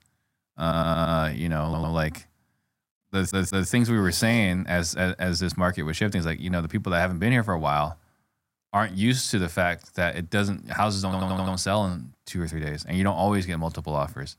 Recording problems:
audio stuttering; 4 times, first at 0.5 s

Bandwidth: 16 kHz